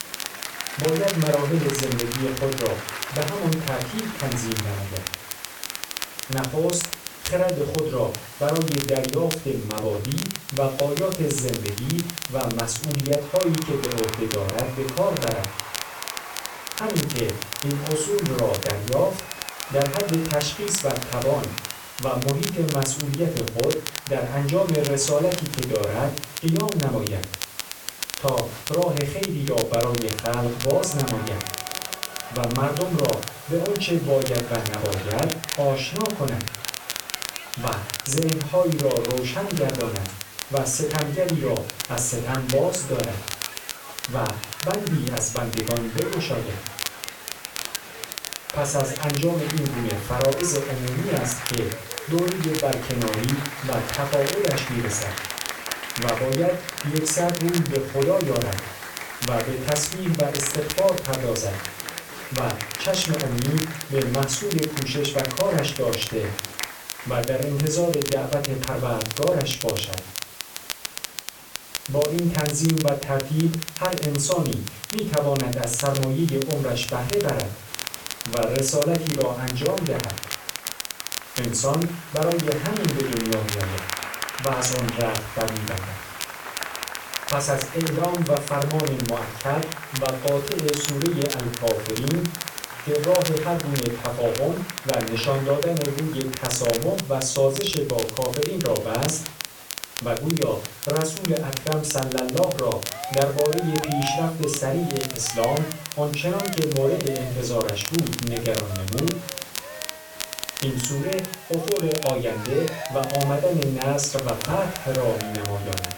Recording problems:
off-mic speech; far
room echo; slight; dies away in 0.3 s
crackle, like an old record; loud; 7 dB below the speech
crowd noise; noticeable; throughout; 15 dB below the speech
hiss; noticeable; throughout; 15 dB below the speech

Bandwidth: 18 kHz